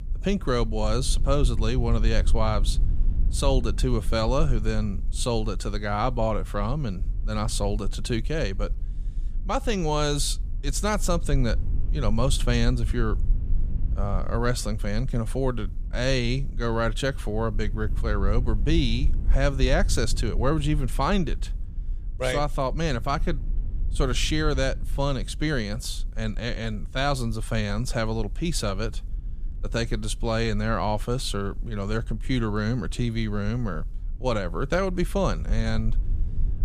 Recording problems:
low rumble; faint; throughout; 20 dB below the speech

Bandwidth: 14.5 kHz